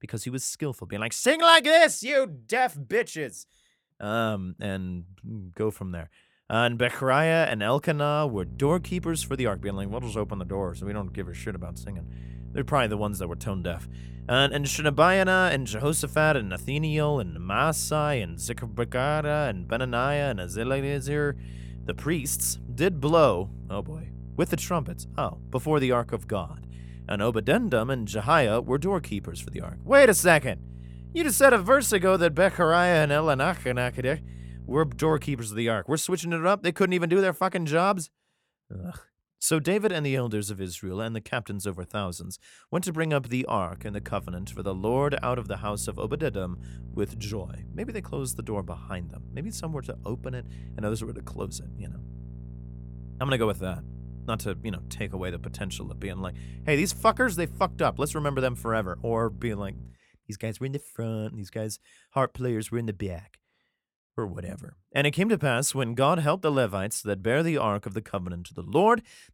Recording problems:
electrical hum; faint; from 8.5 to 35 s and from 44 s to 1:00; 60 Hz, 30 dB below the speech

